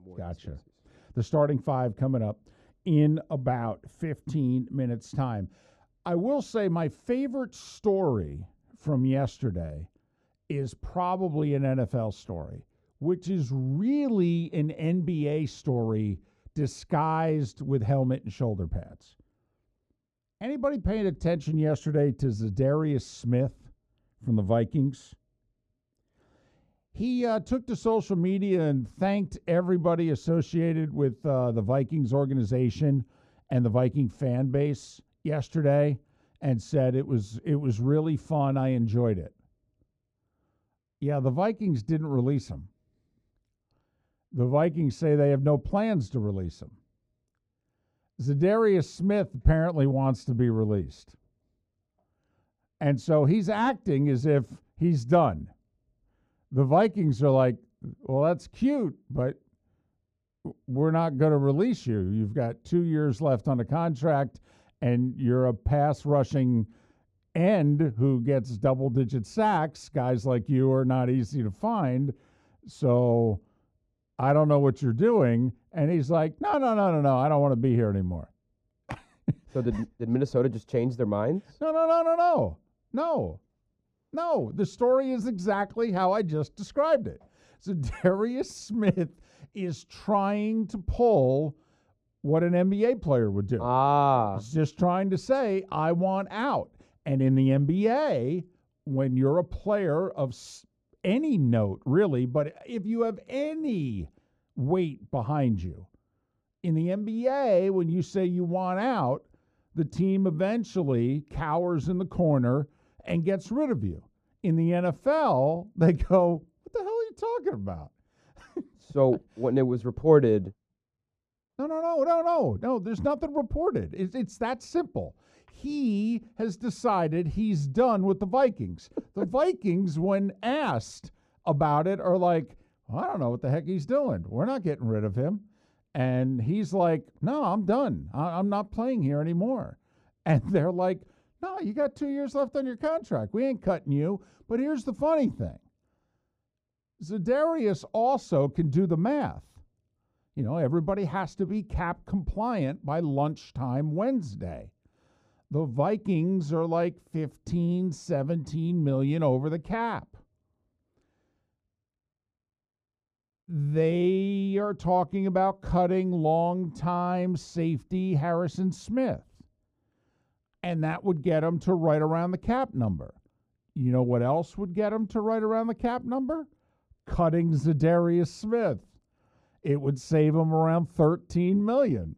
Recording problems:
muffled; very; fading above 1 kHz

